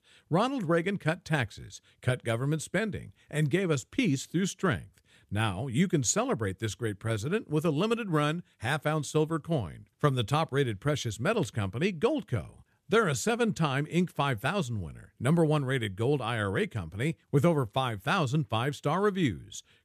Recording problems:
none

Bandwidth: 14.5 kHz